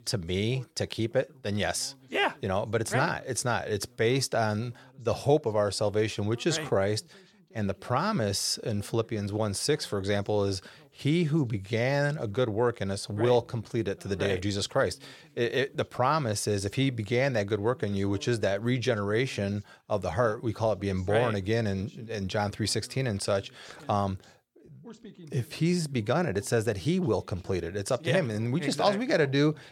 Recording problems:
voice in the background; faint; throughout; 25 dB below the speech

